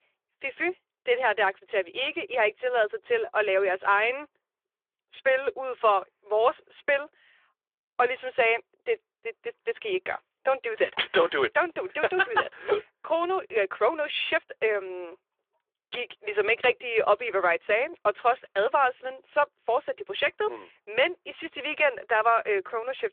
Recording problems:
phone-call audio; nothing above 3.5 kHz

